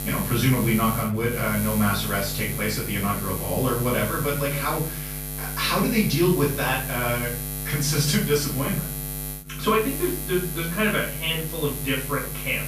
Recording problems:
off-mic speech; far
room echo; noticeable; dies away in 0.5 s
electrical hum; loud; throughout; 60 Hz, 10 dB below the speech

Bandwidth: 15 kHz